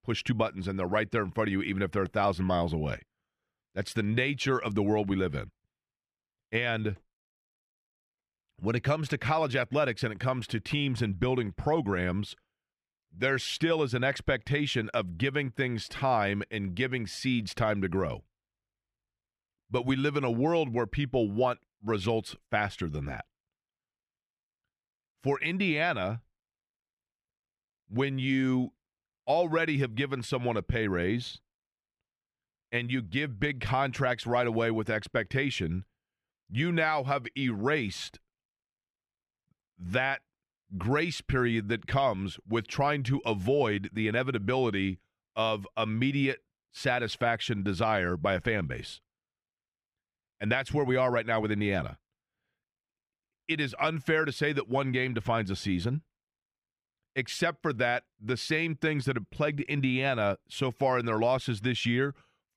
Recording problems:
muffled; slightly; fading above 4 kHz

